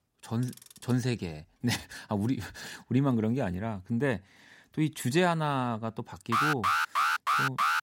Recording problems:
household noises; faint; until 2 s; 20 dB below the speech
alarm; loud; from 6.5 s on; peak 5 dB above the speech

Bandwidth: 16 kHz